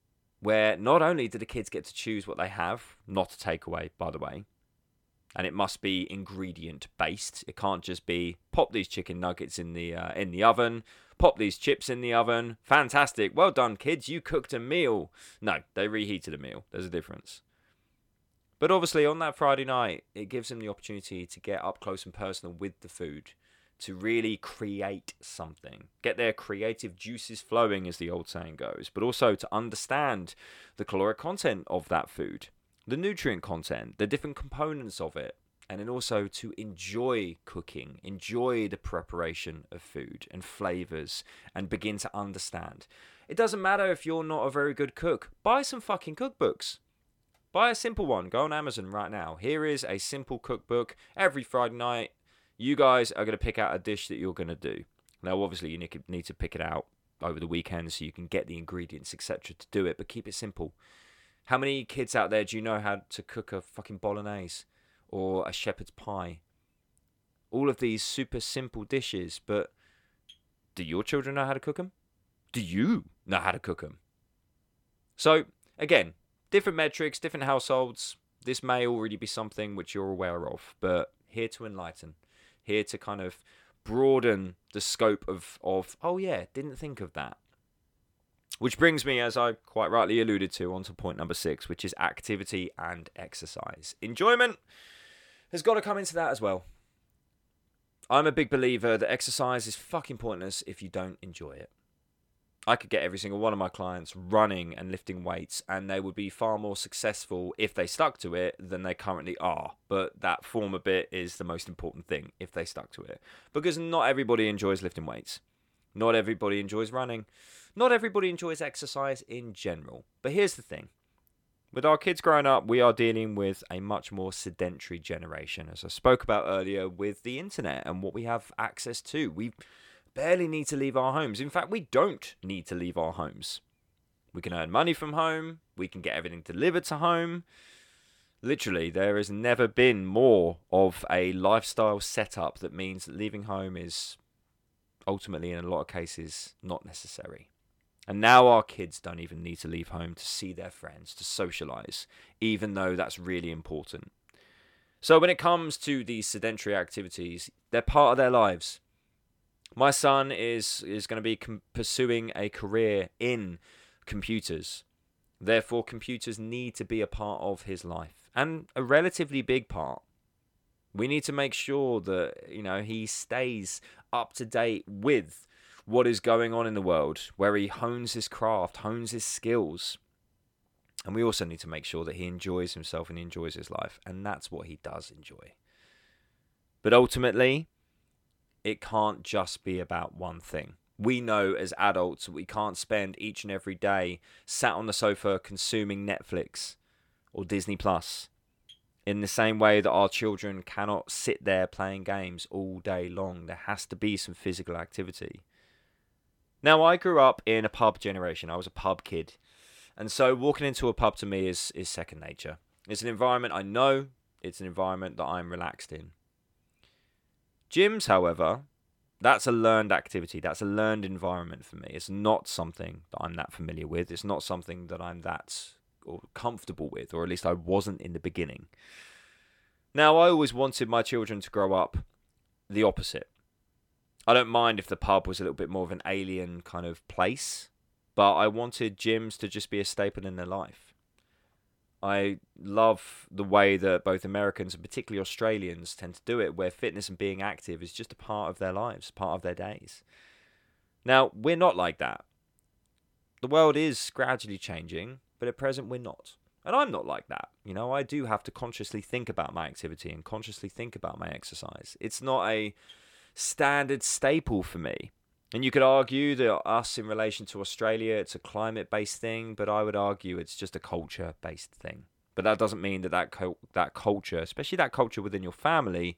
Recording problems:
none

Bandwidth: 17.5 kHz